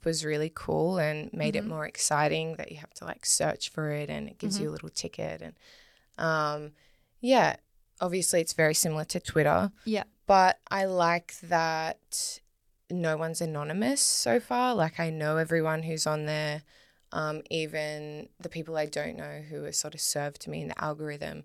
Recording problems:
none

